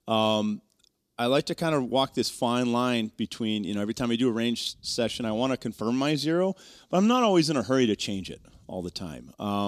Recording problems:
abrupt cut into speech; at the end

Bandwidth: 14.5 kHz